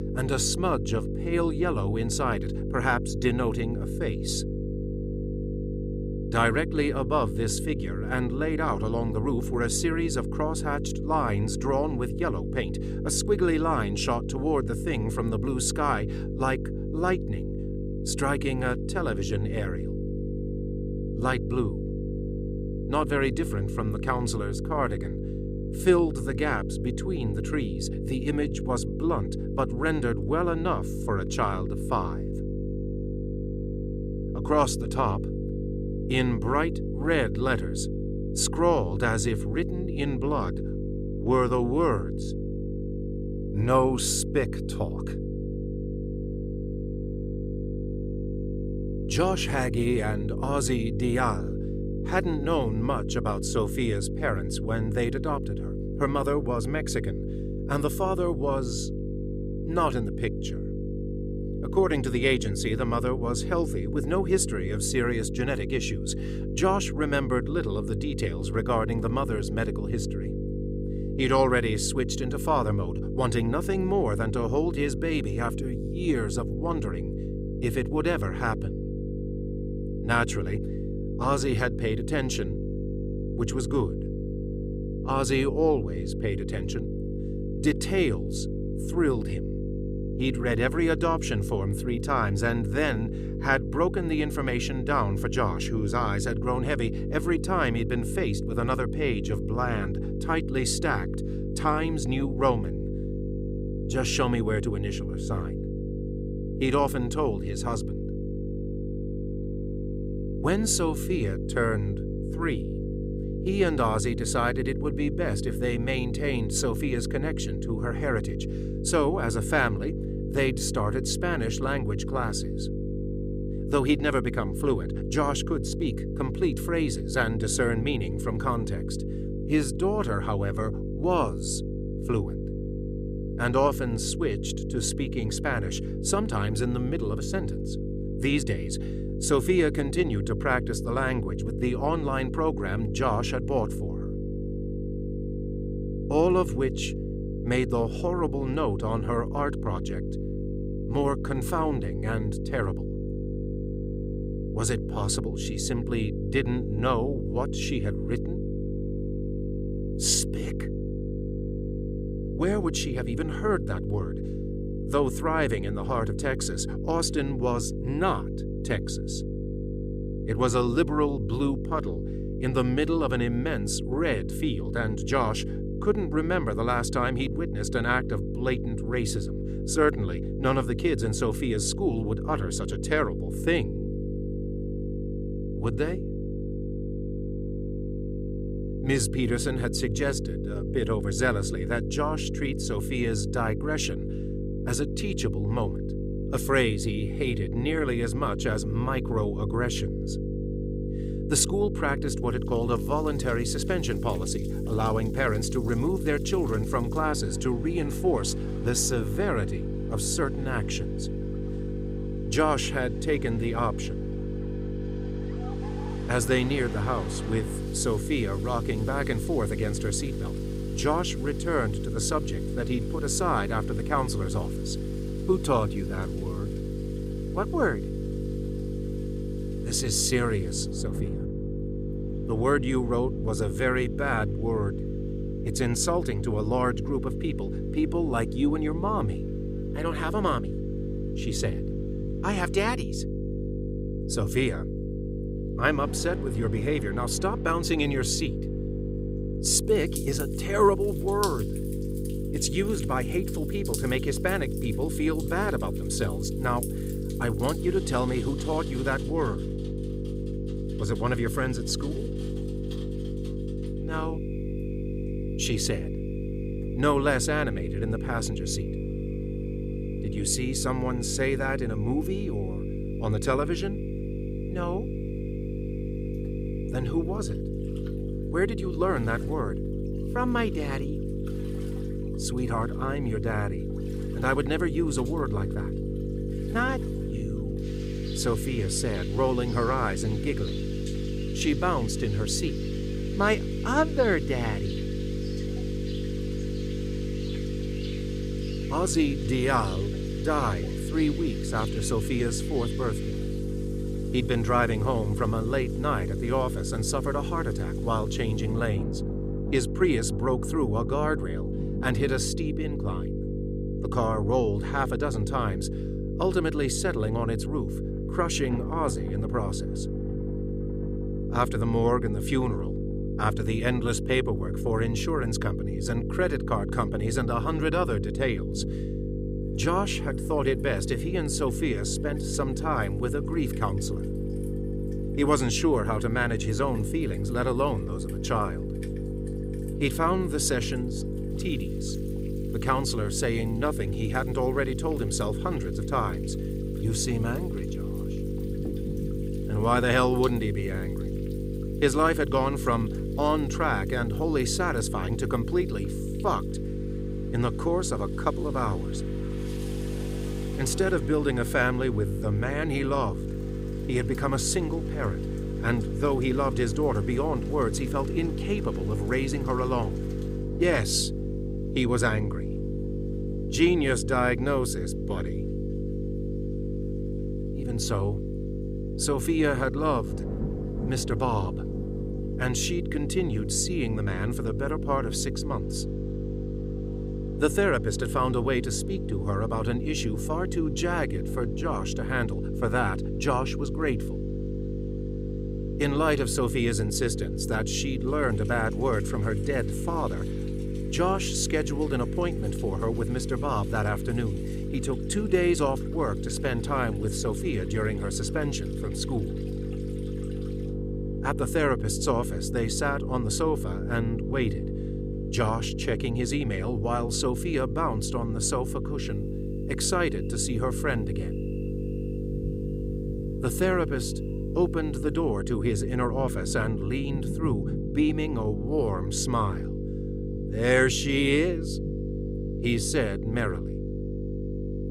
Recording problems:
electrical hum; loud; throughout; 50 Hz, 9 dB below the speech
rain or running water; noticeable; from 3:23 on; 20 dB below the speech

